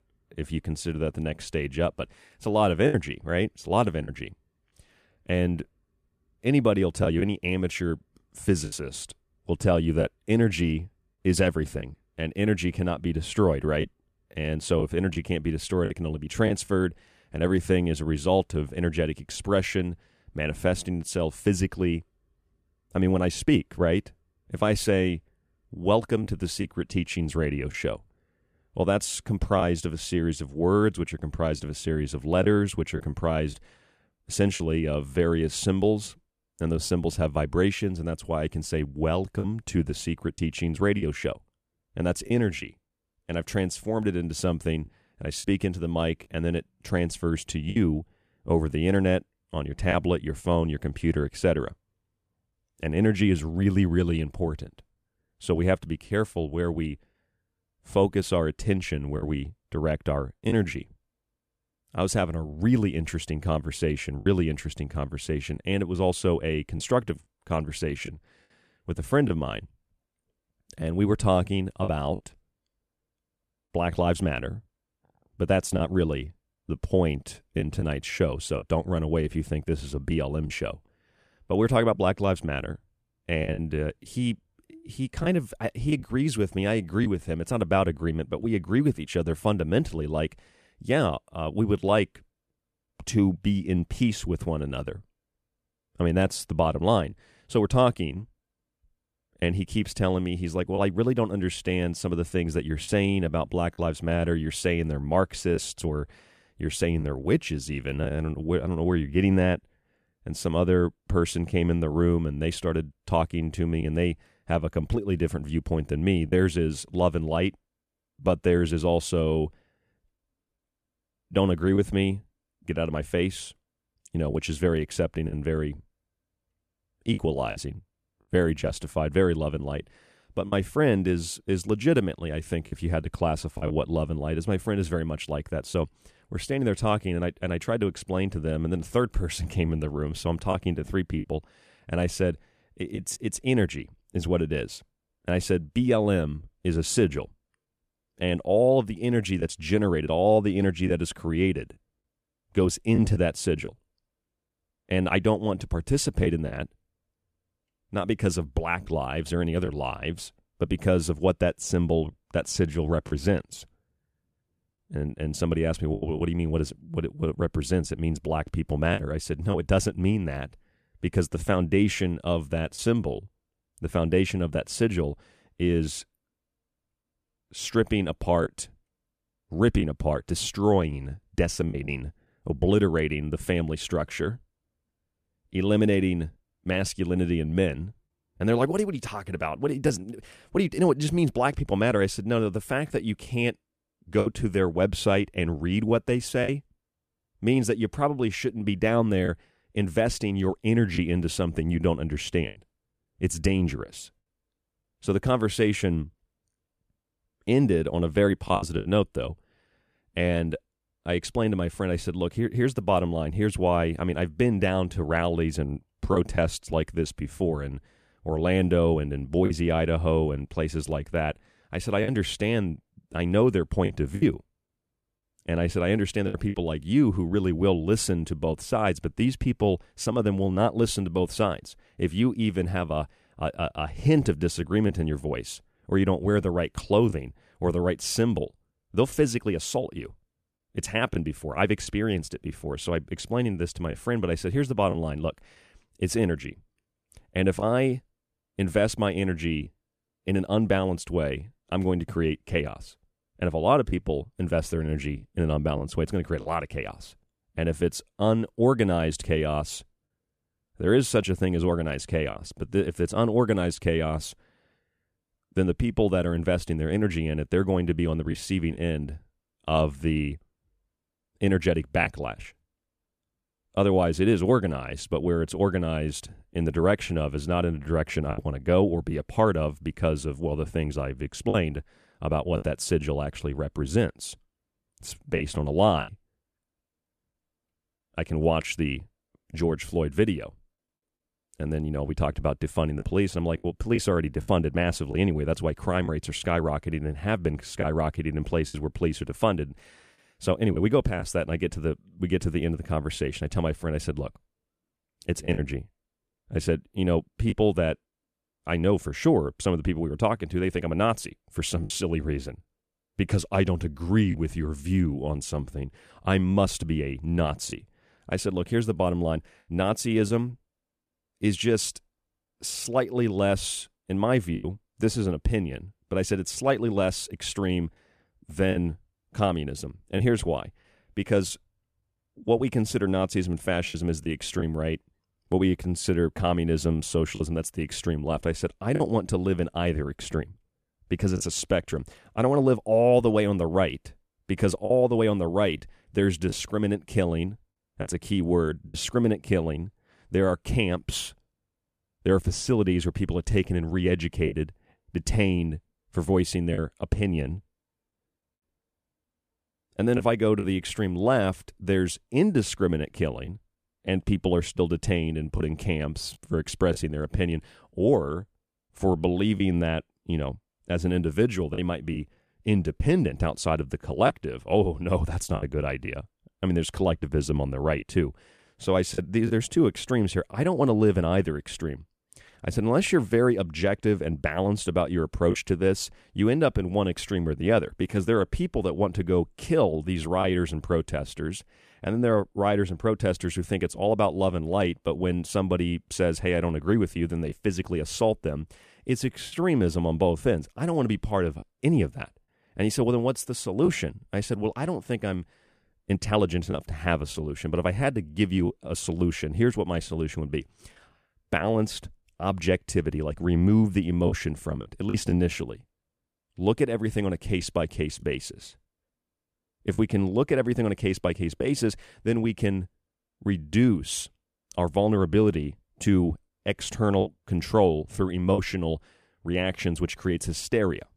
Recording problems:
choppy; occasionally; 2% of the speech affected

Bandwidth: 14.5 kHz